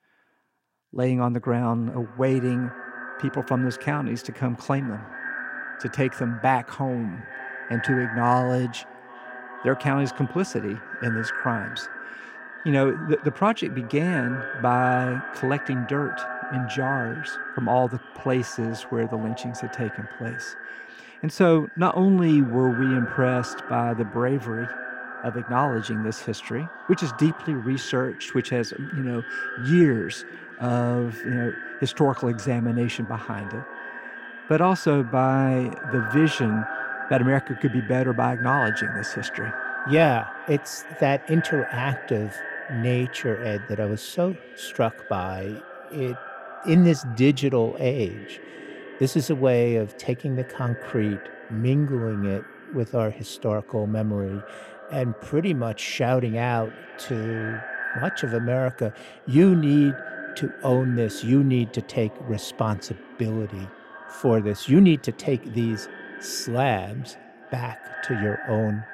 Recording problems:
echo of what is said; strong; throughout; 410 ms later, 10 dB below the speech

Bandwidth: 16 kHz